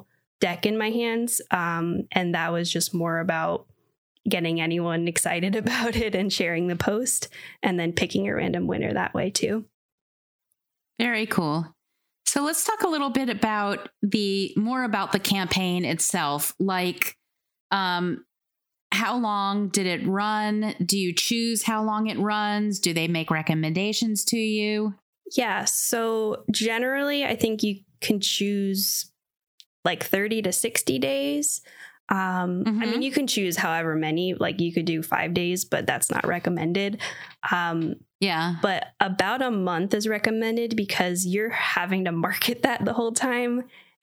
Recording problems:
squashed, flat; somewhat

